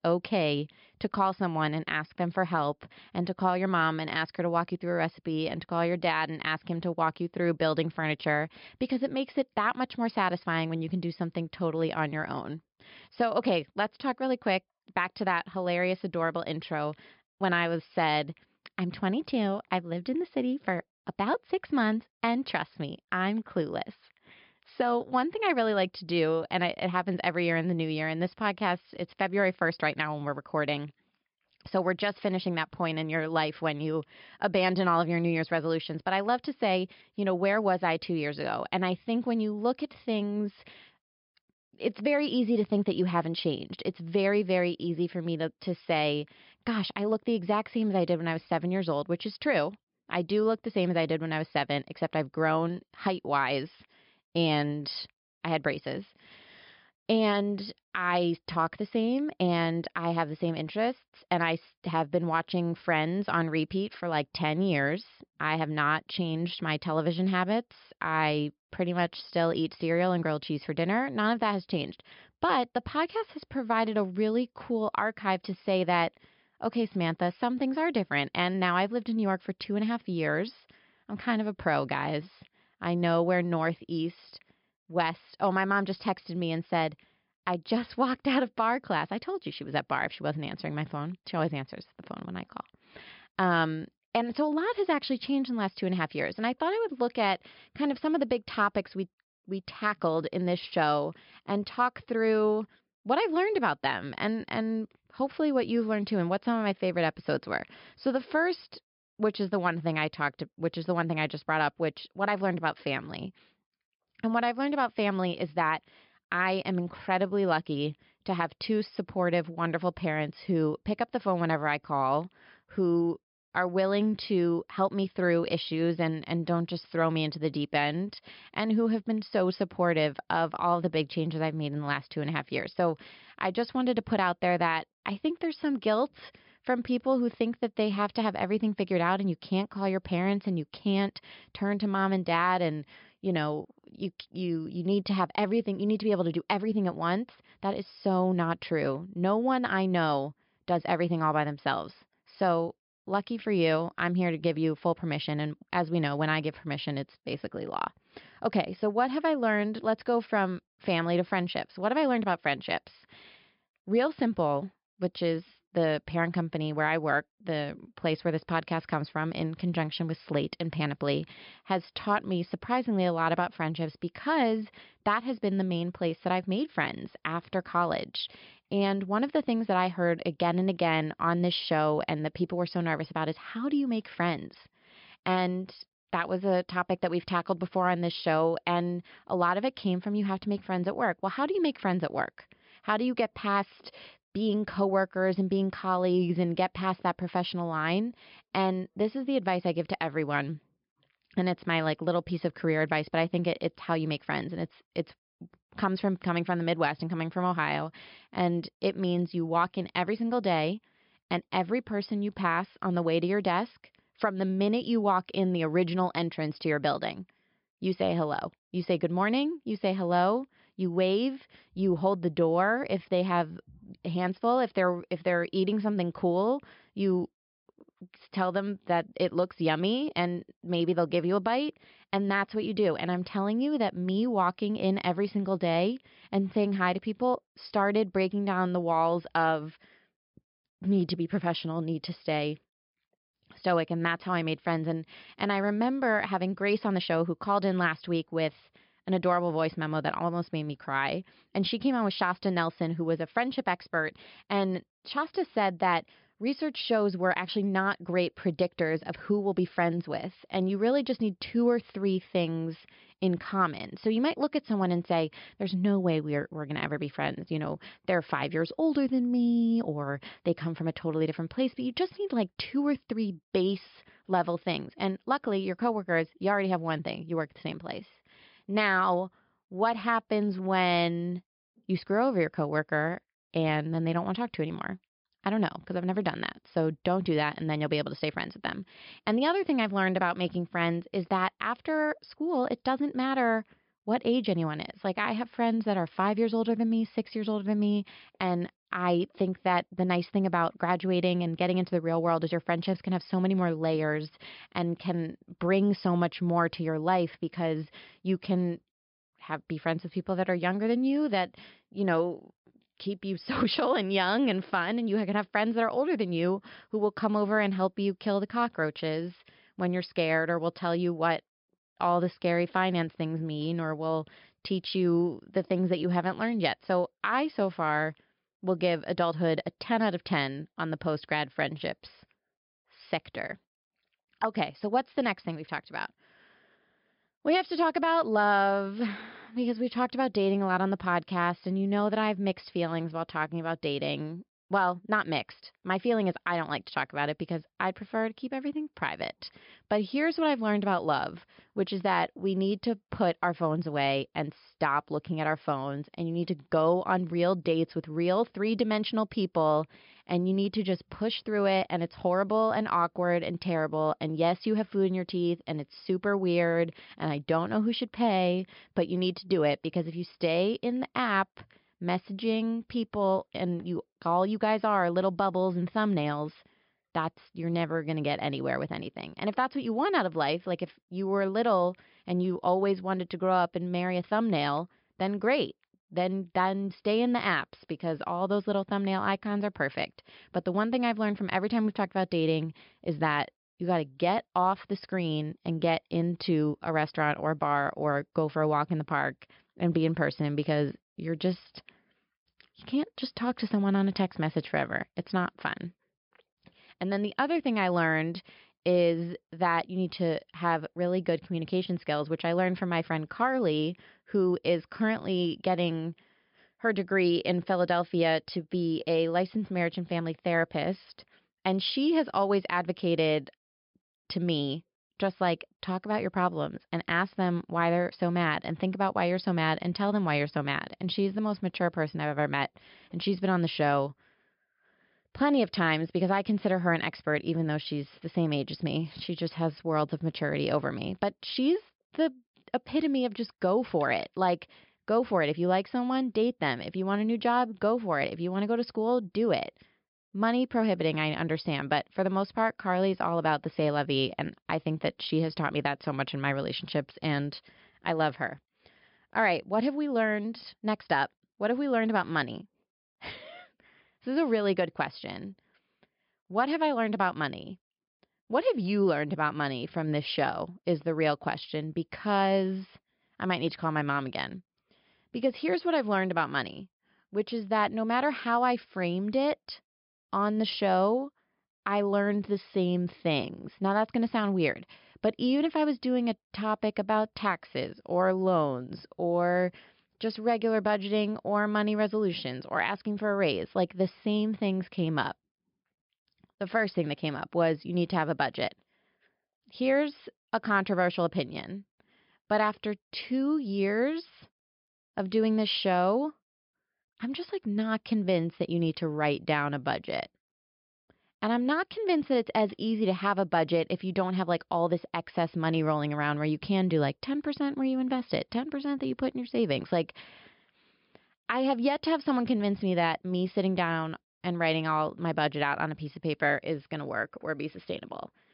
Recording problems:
high frequencies cut off; noticeable; nothing above 5.5 kHz

